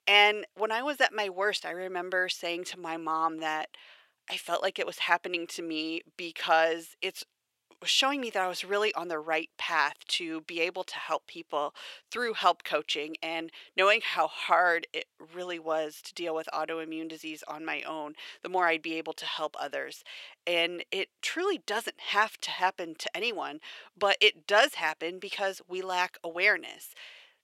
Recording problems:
thin; very; fading below 600 Hz

